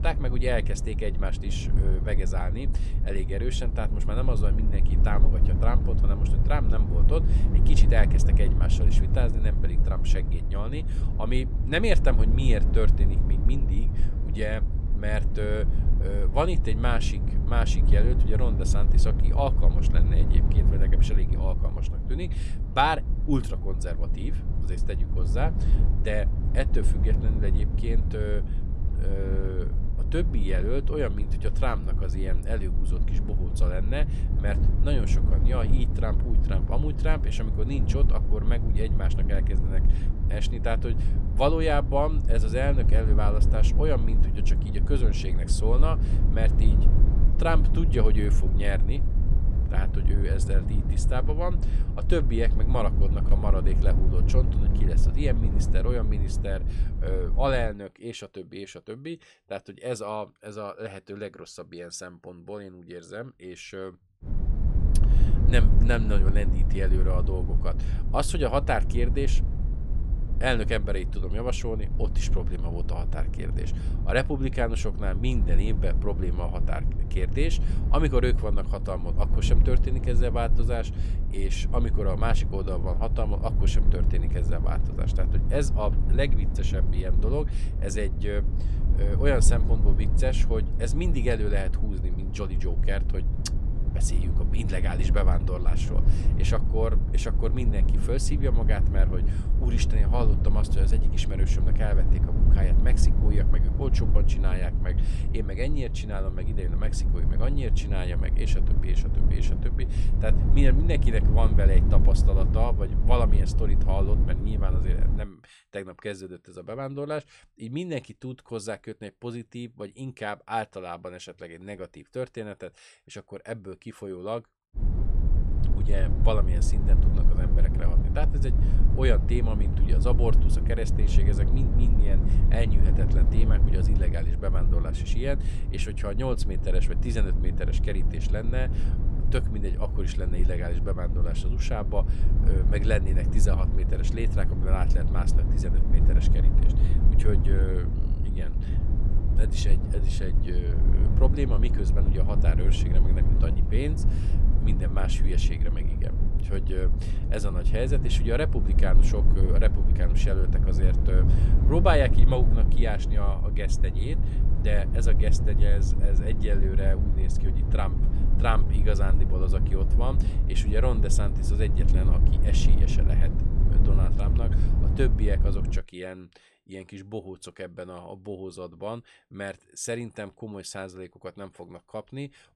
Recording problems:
low rumble; loud; until 58 s, from 1:04 to 1:55 and from 2:05 to 2:56; 8 dB below the speech

